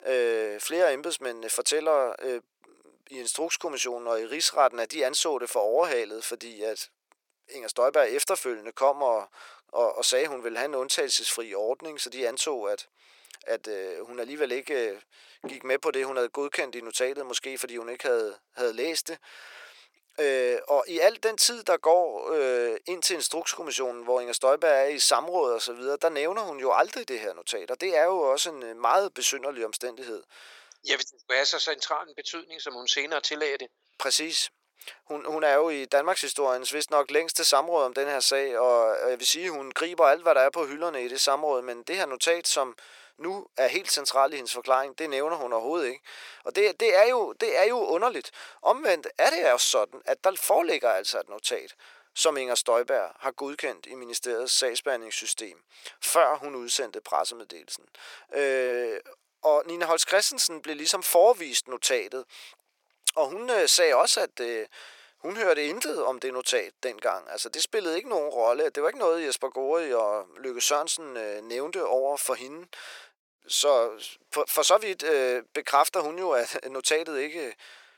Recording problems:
thin; very; fading below 450 Hz

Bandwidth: 17 kHz